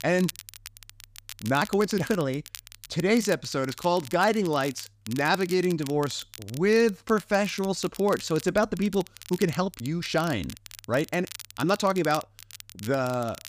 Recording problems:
crackle, like an old record; noticeable; 15 dB below the speech
uneven, jittery; strongly; from 1.5 to 12 s

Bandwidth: 15 kHz